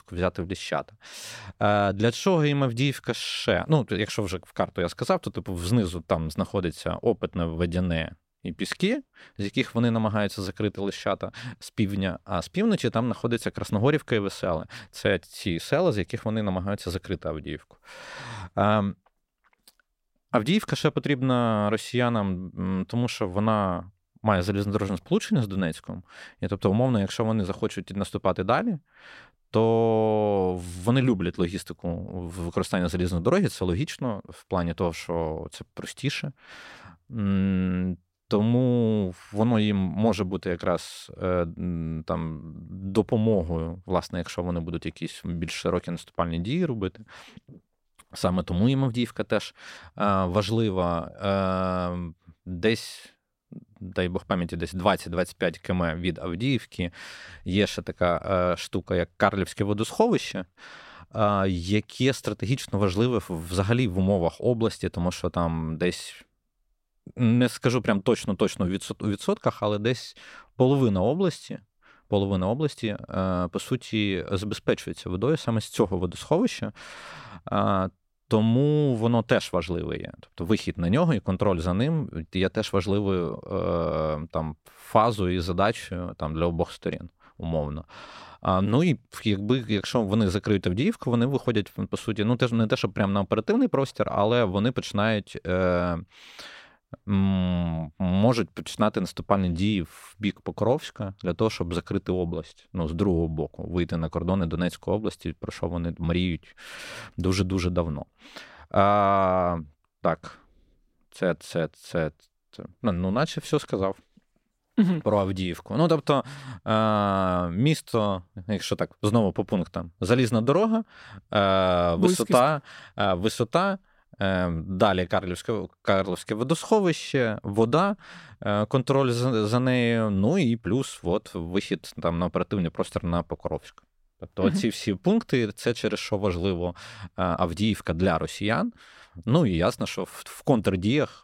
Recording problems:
none

